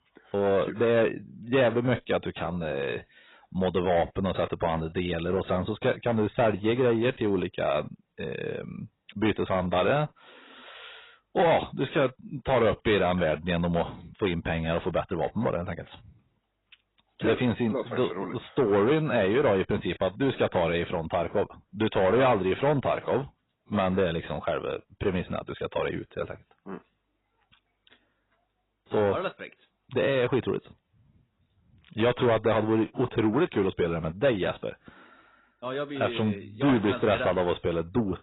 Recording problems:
garbled, watery; badly; nothing above 4 kHz
distortion; slight; 10 dB below the speech

